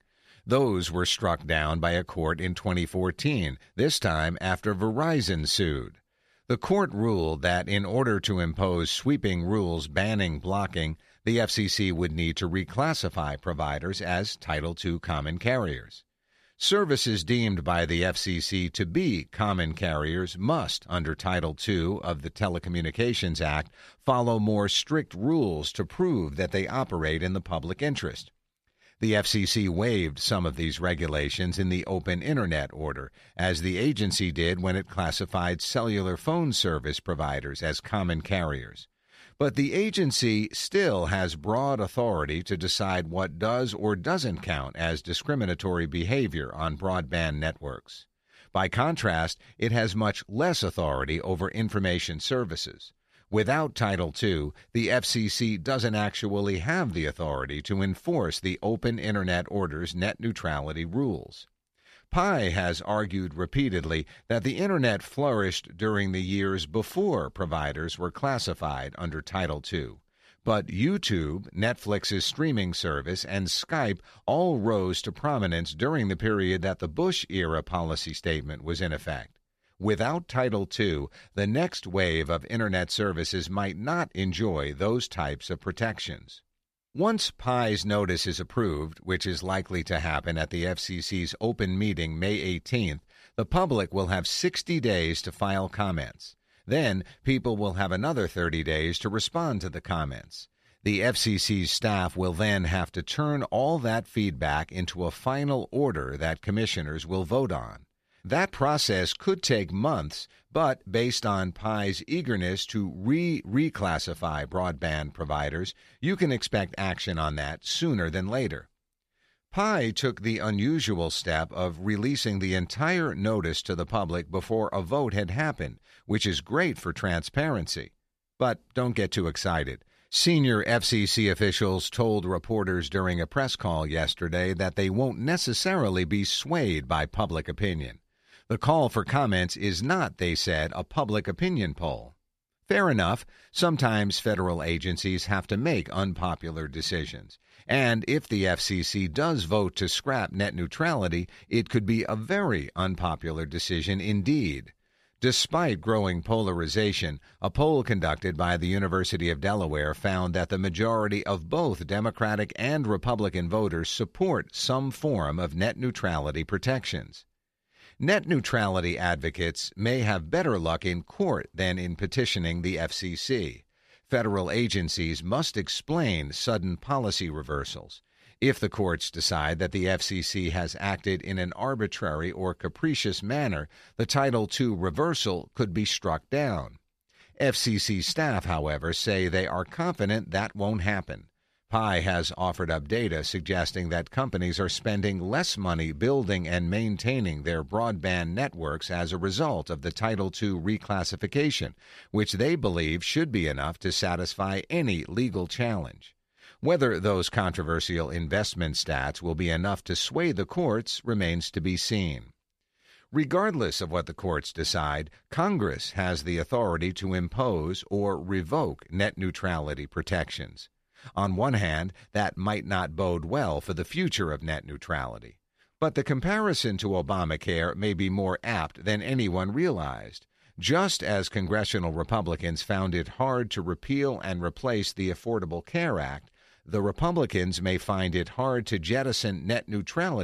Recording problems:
abrupt cut into speech; at the end

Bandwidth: 14.5 kHz